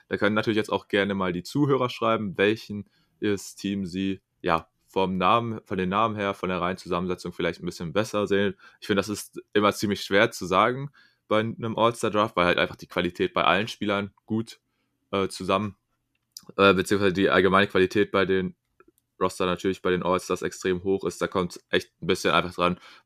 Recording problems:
none

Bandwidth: 15 kHz